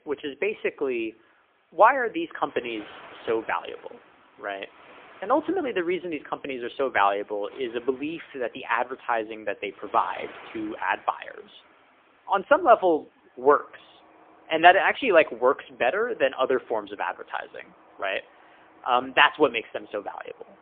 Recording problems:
phone-call audio; poor line
traffic noise; faint; throughout; 25 dB below the speech

